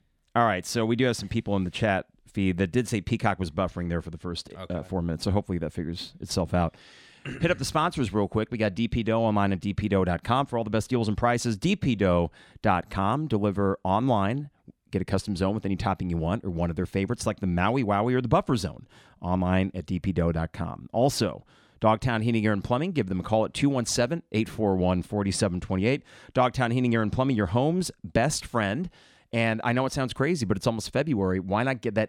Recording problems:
none

